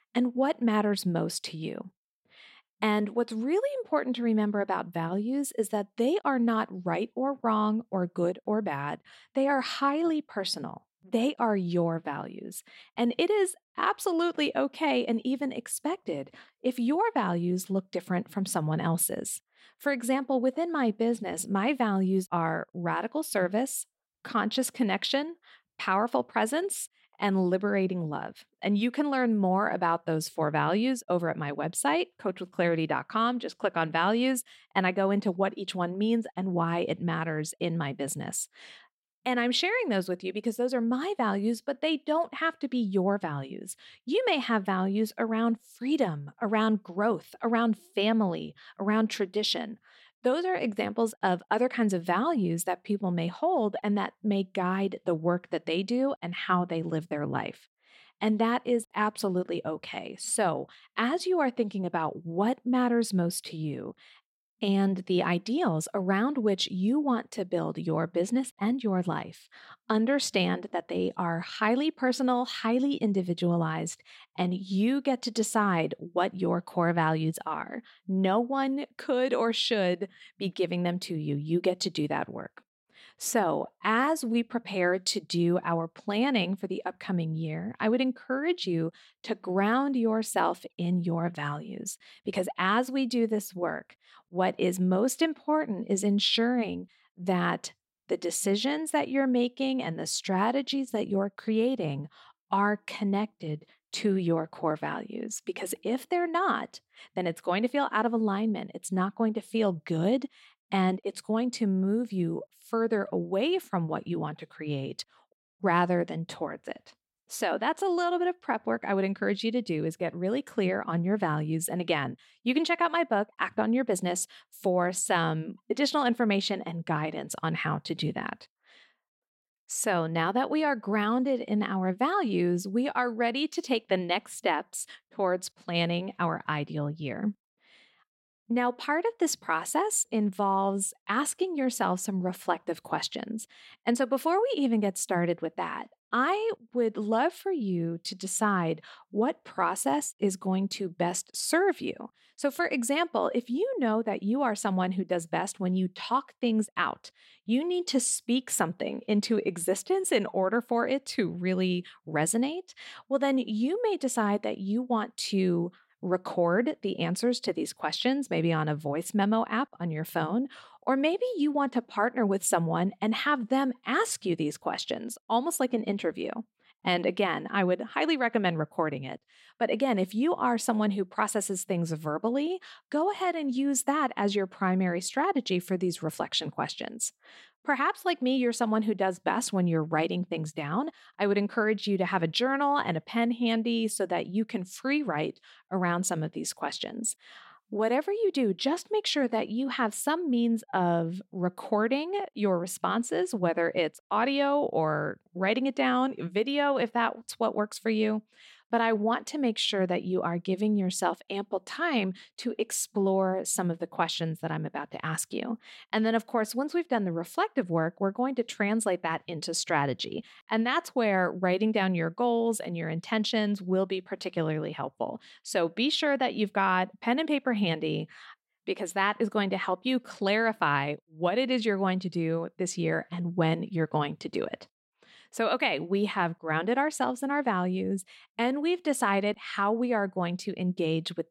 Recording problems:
none

